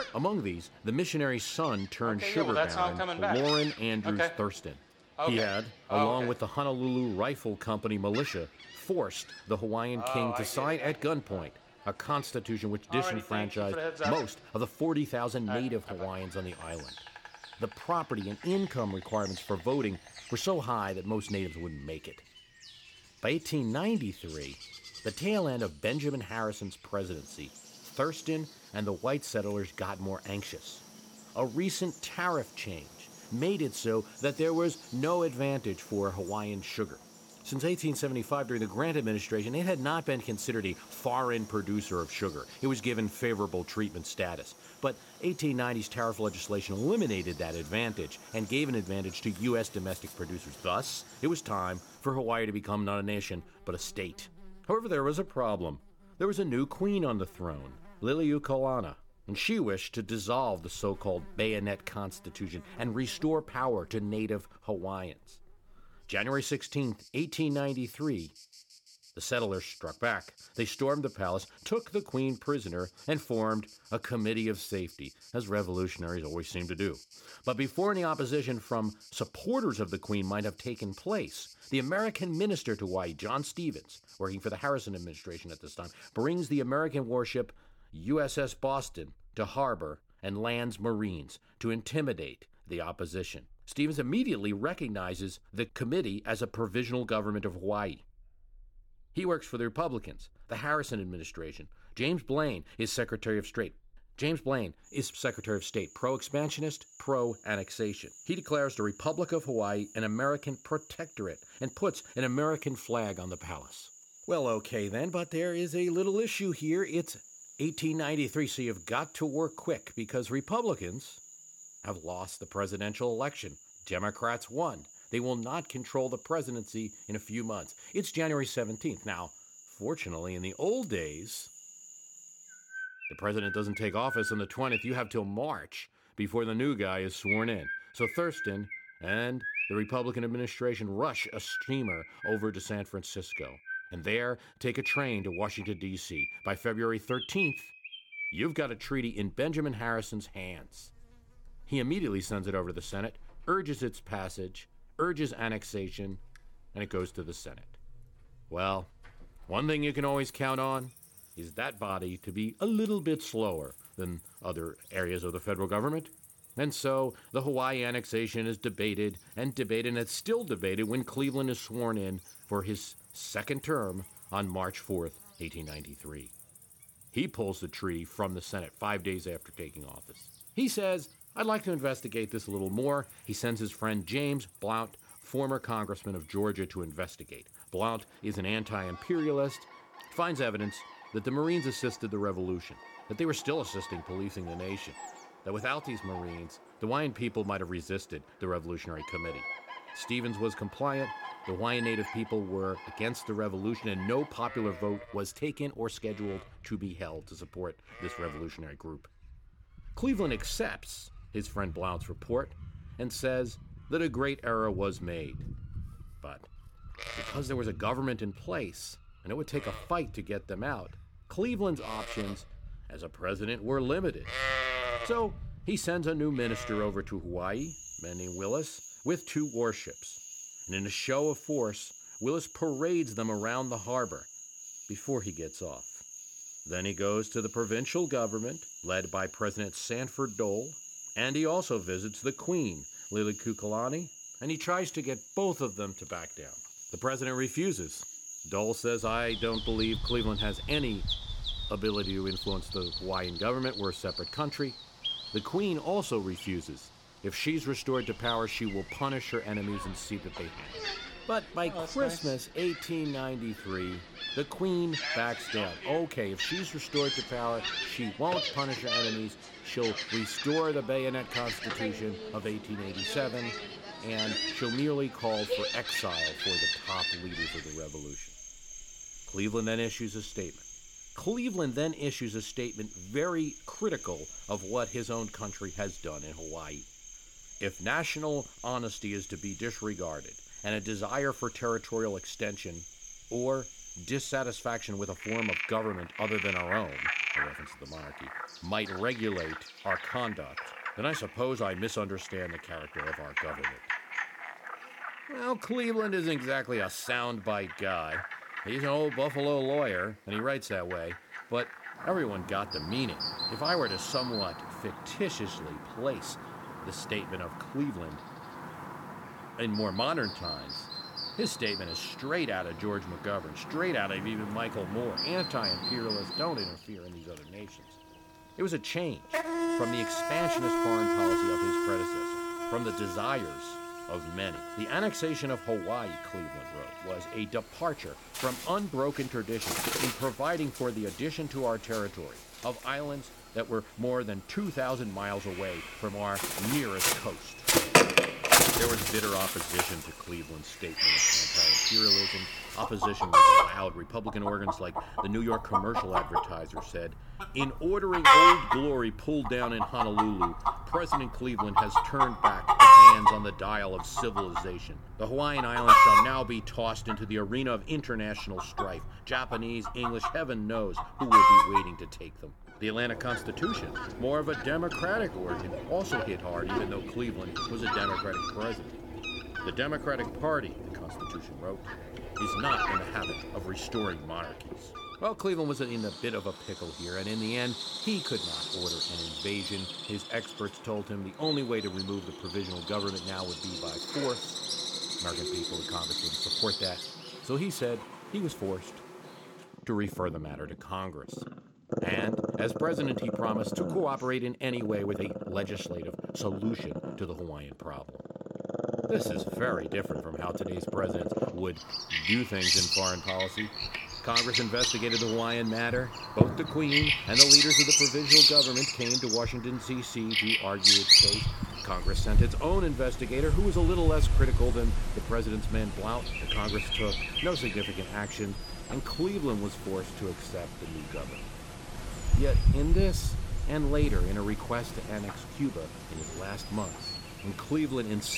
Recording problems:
animal sounds; very loud; throughout; 5 dB above the speech
abrupt cut into speech; at the end

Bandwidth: 17 kHz